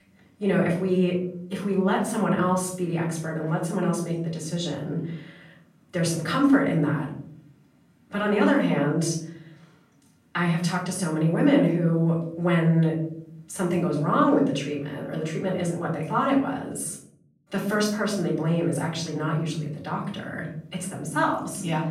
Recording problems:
off-mic speech; far
room echo; noticeable; dies away in 0.6 s

